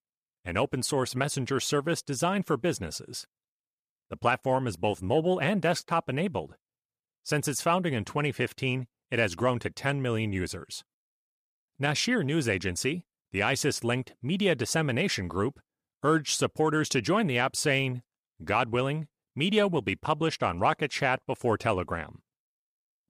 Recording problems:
none

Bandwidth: 14.5 kHz